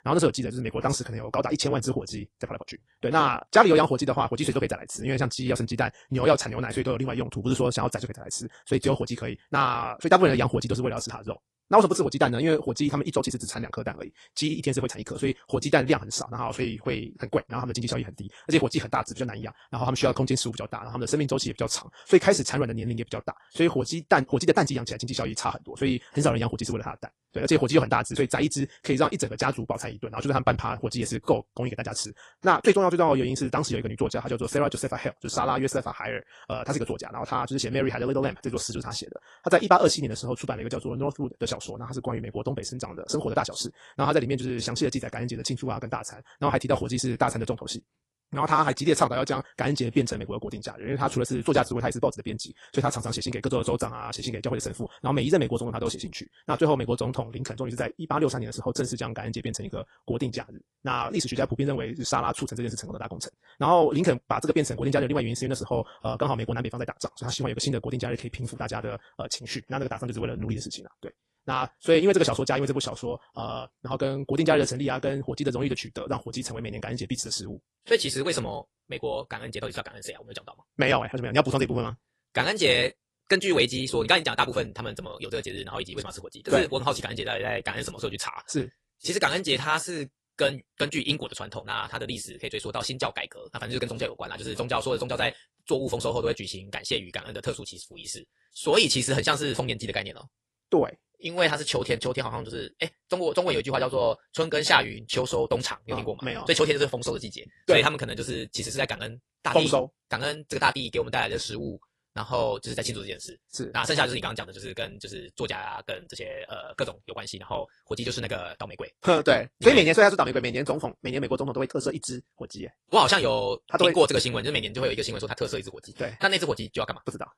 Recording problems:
wrong speed, natural pitch; too fast; 1.7 times normal speed
garbled, watery; slightly

